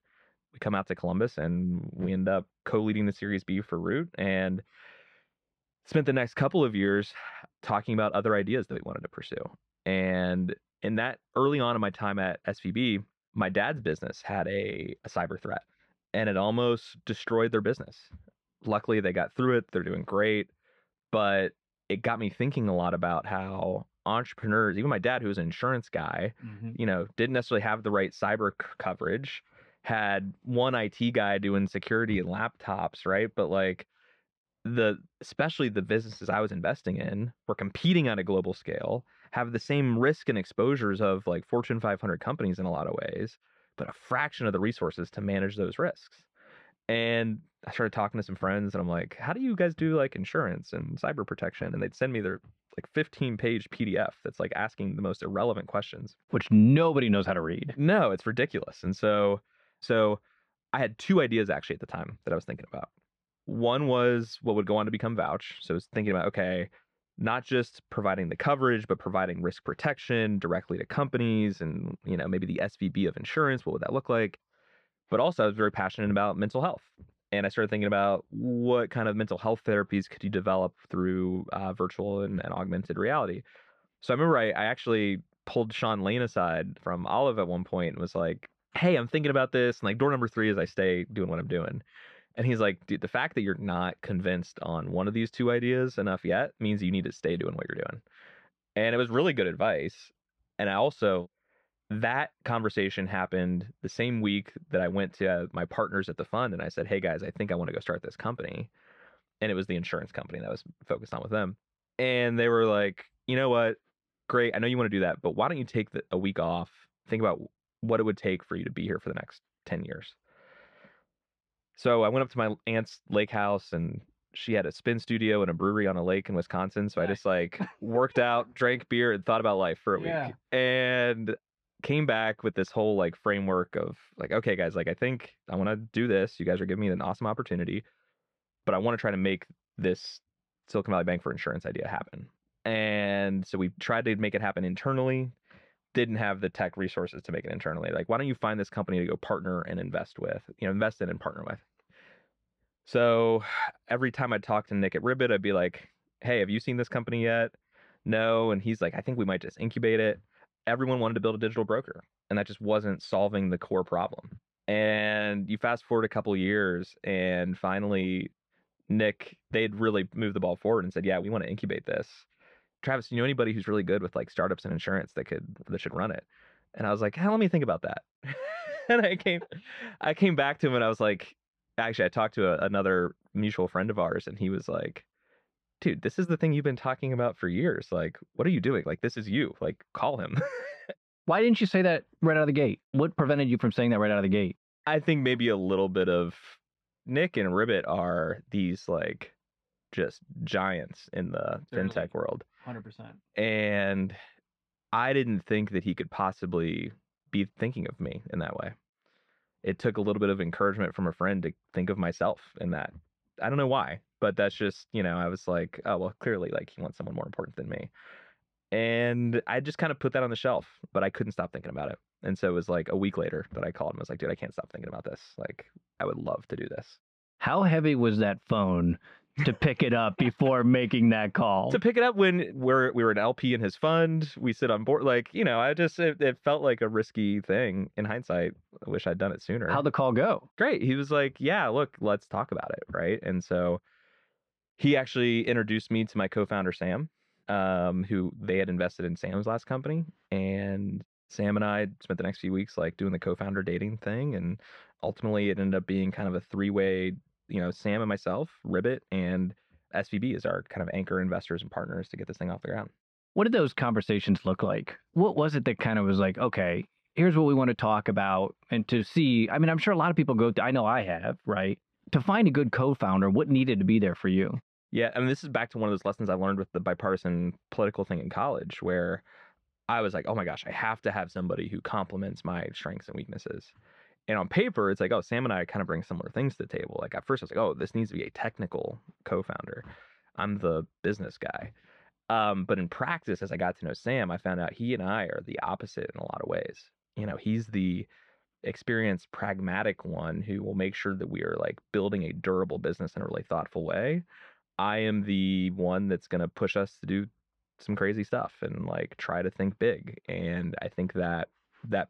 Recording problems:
muffled; slightly; fading above 2.5 kHz

